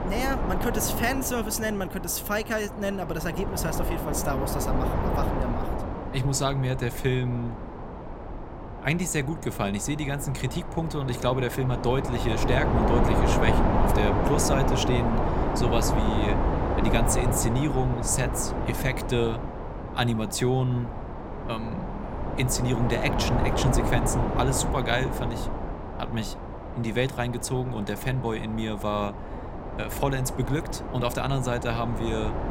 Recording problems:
wind noise on the microphone; heavy; 2 dB below the speech

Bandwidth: 16 kHz